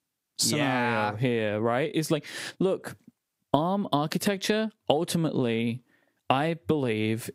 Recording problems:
squashed, flat; heavily

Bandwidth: 15.5 kHz